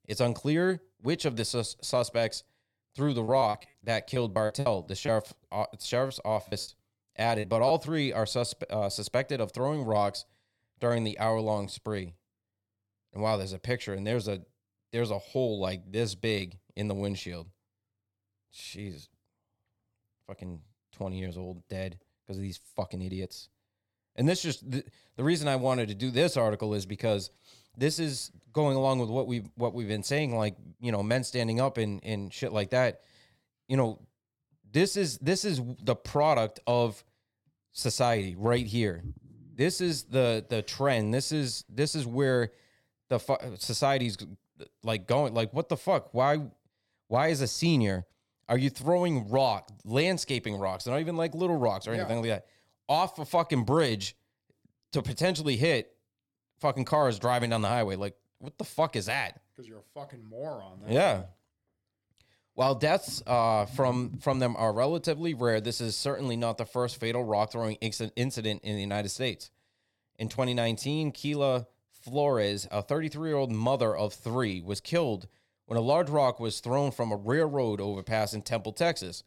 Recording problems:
choppy; very; from 3 to 7.5 s; 13% of the speech affected

